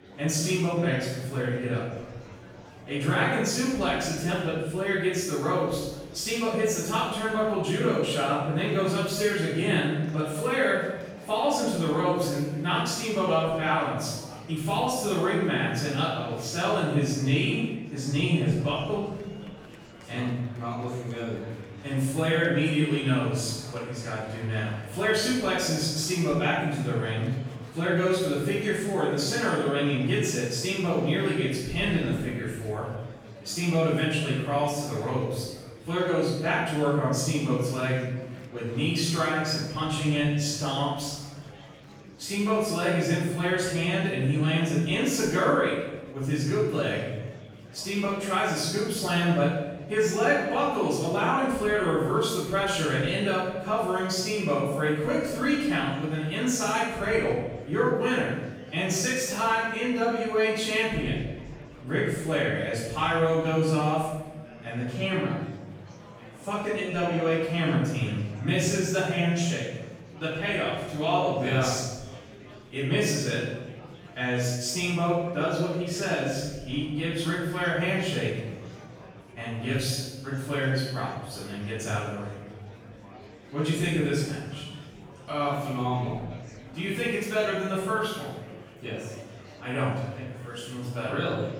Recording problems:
room echo; strong; dies away in 1.1 s
off-mic speech; far
murmuring crowd; faint; throughout; 20 dB below the speech

